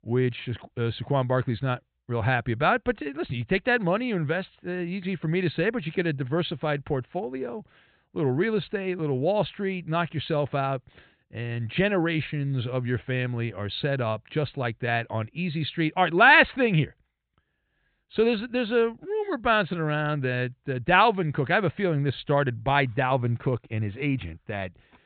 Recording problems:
high frequencies cut off; severe; nothing above 4 kHz

